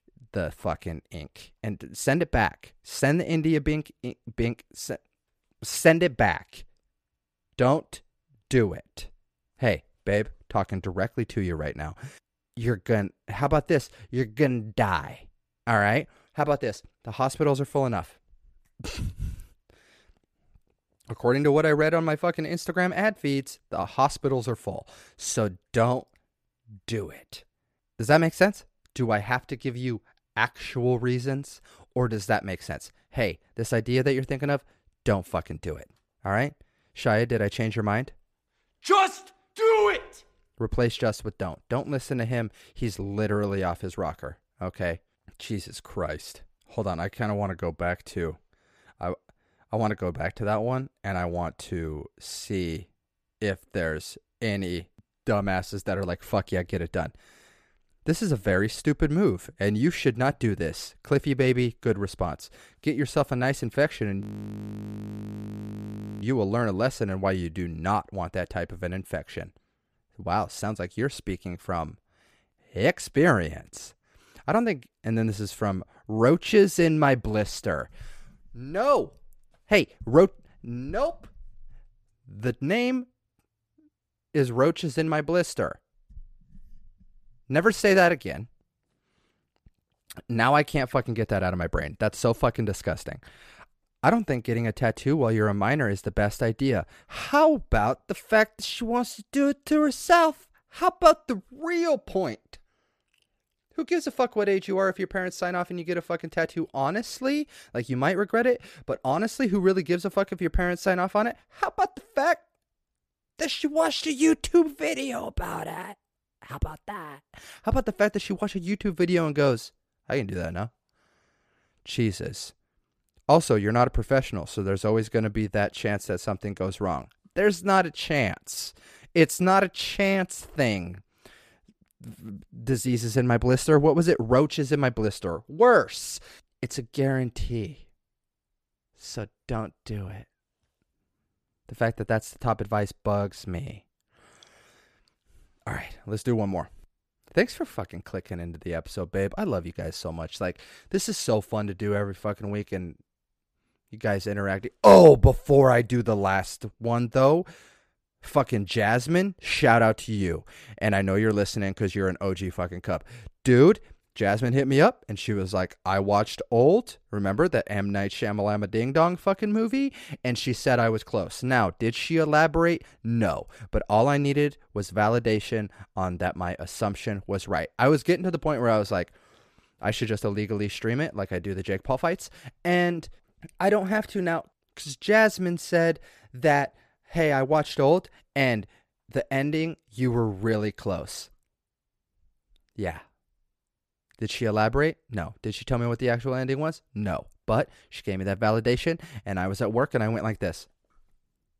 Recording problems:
audio freezing; at 1:04 for 2 s

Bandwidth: 14.5 kHz